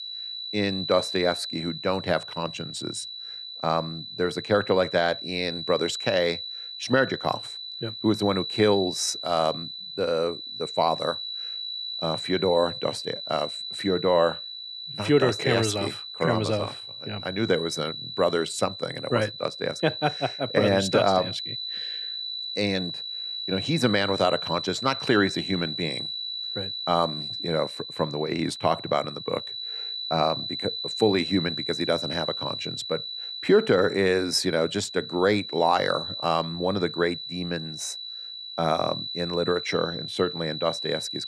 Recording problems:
high-pitched whine; loud; throughout; 4 kHz, 6 dB below the speech

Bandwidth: 13 kHz